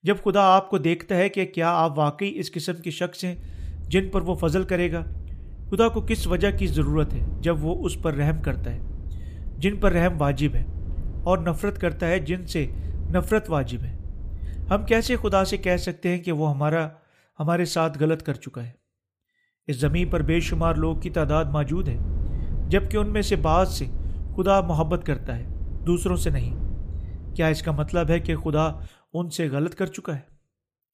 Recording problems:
low rumble; faint; from 3.5 to 16 s and from 20 to 29 s; 25 dB below the speech

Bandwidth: 15 kHz